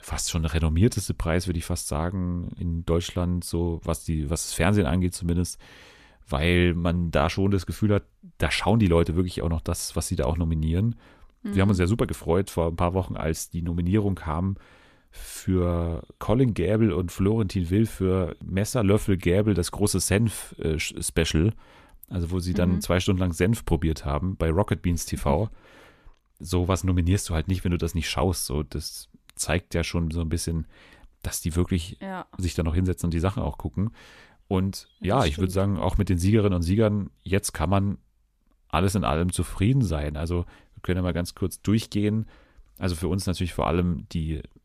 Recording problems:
none

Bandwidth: 14.5 kHz